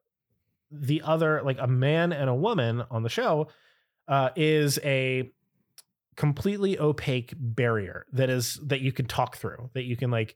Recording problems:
none

